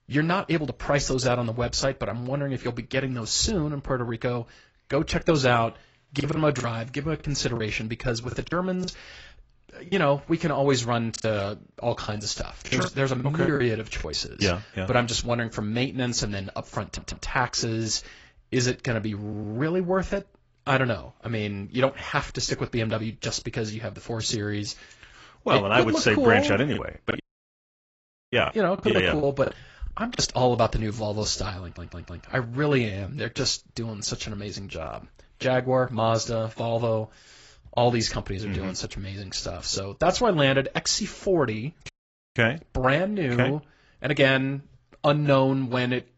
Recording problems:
garbled, watery; badly; nothing above 7.5 kHz
choppy; very; from 6 to 10 s, from 11 to 14 s and from 27 to 30 s; 12% of the speech affected
audio stuttering; at 17 s, at 19 s and at 32 s
audio cutting out; at 27 s for 1 s and at 42 s

